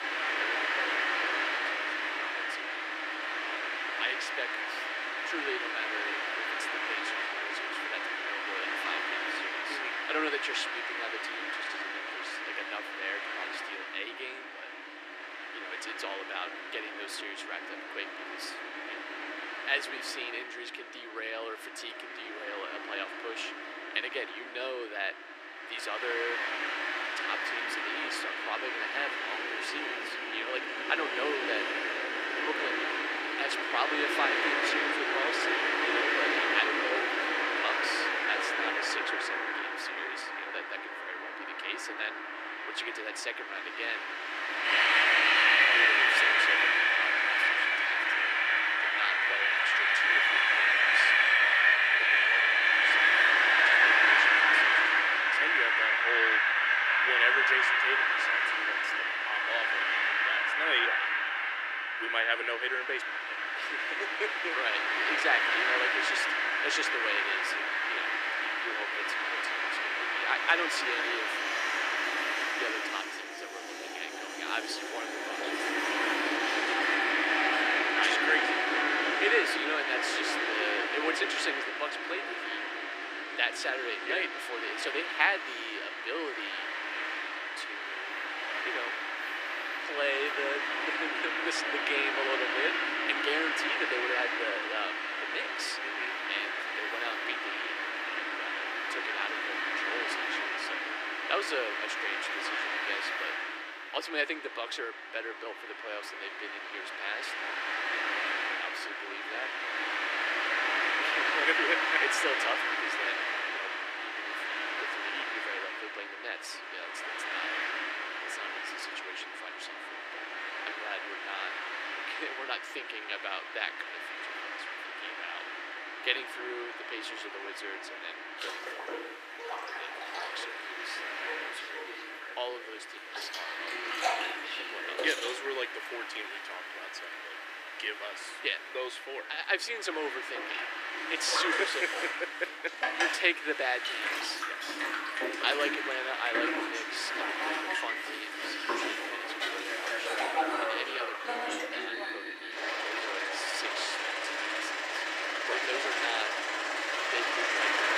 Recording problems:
thin; very; fading below 300 Hz
train or aircraft noise; very loud; throughout; 7 dB above the speech

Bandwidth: 14.5 kHz